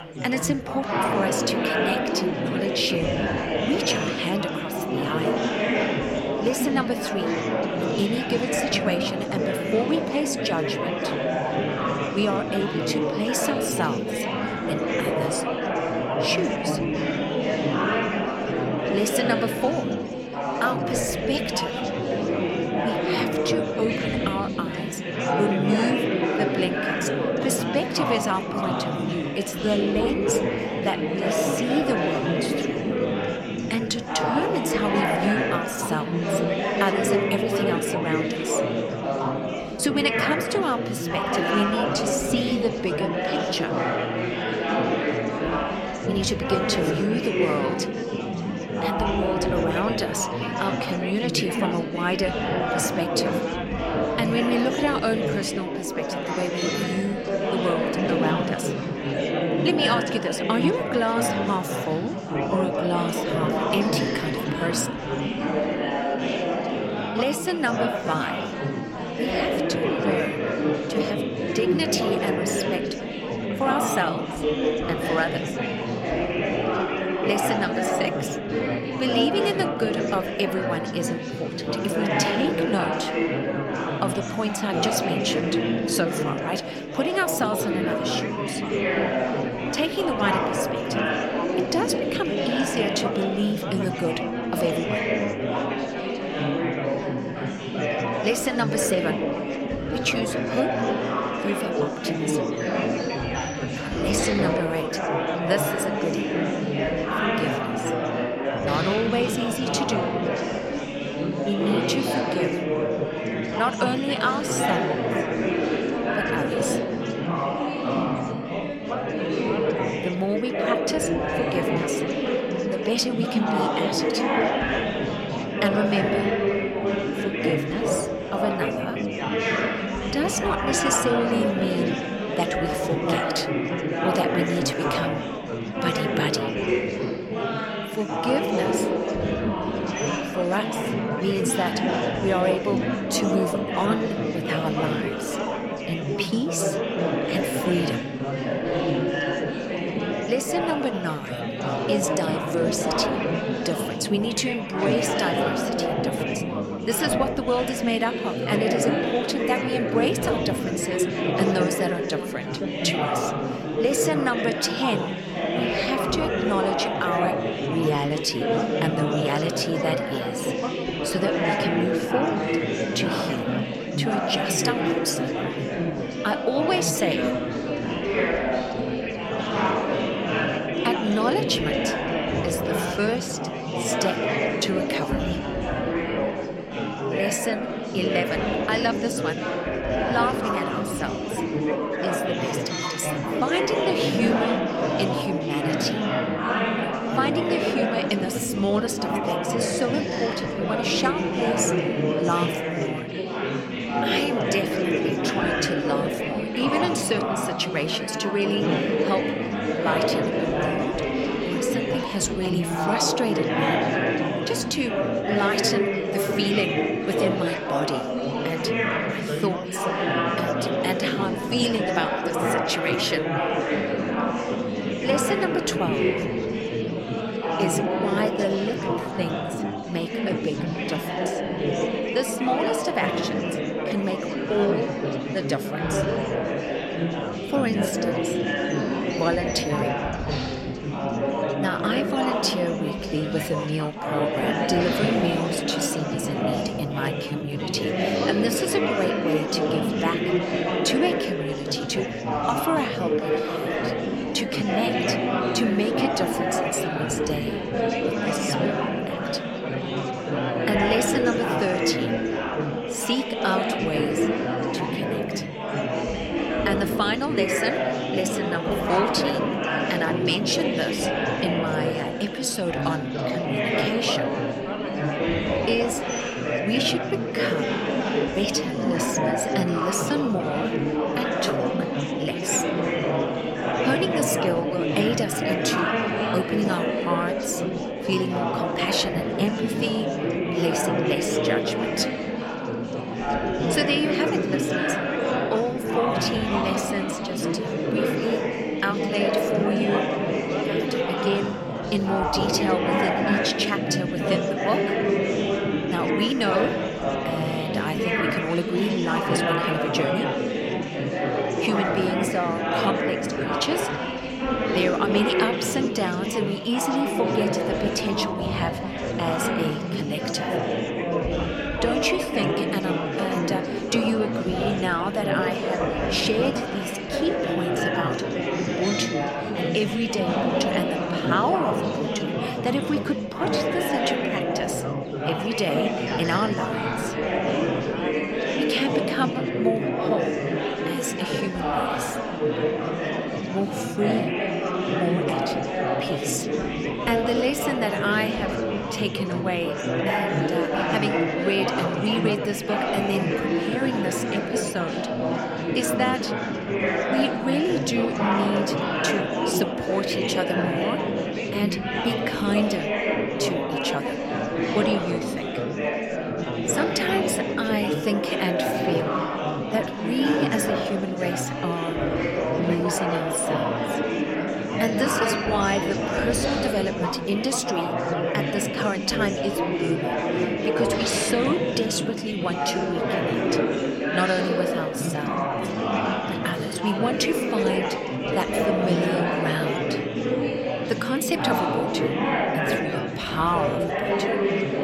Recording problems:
chatter from many people; very loud; throughout; 2 dB above the speech

